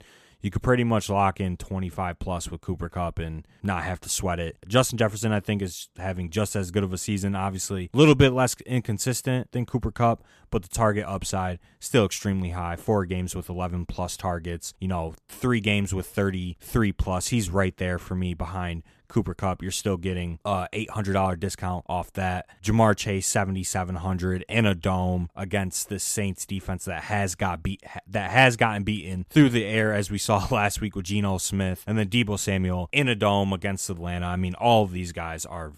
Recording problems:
none

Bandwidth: 14 kHz